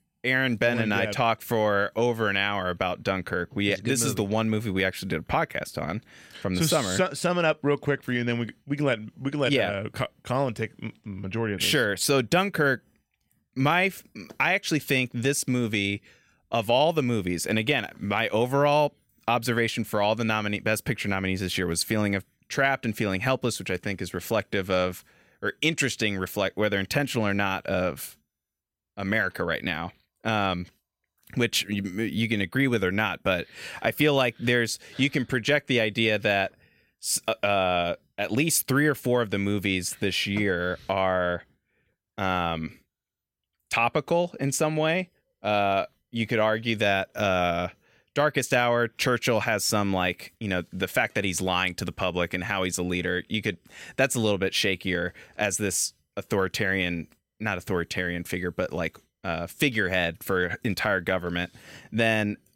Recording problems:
none

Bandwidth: 16 kHz